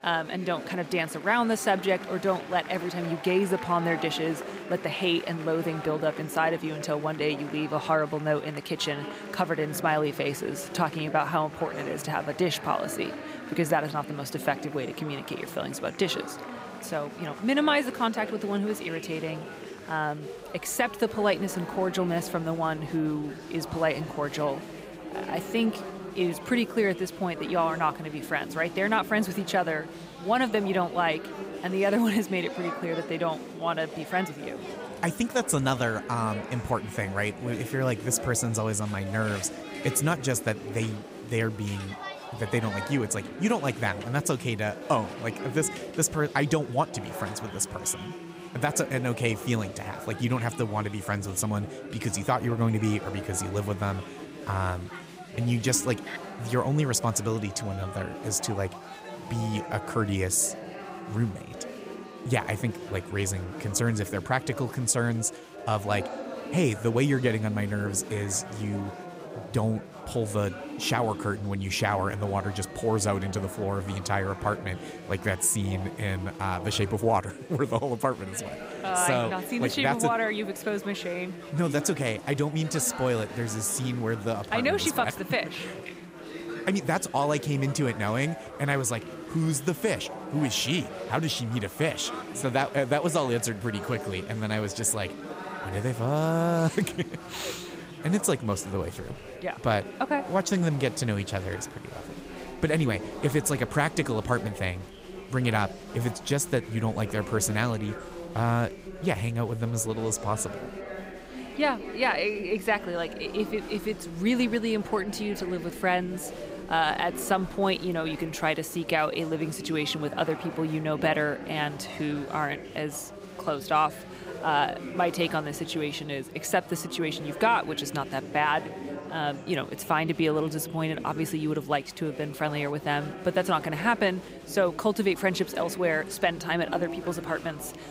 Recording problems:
chatter from many people; noticeable; throughout; 10 dB below the speech

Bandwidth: 15.5 kHz